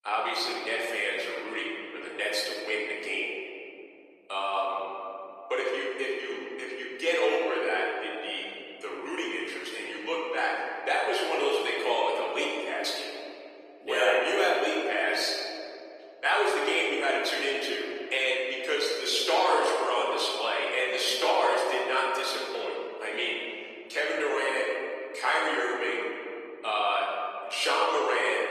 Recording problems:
off-mic speech; far
thin; very; fading below 400 Hz
room echo; noticeable; dies away in 2.4 s
garbled, watery; slightly; nothing above 14.5 kHz

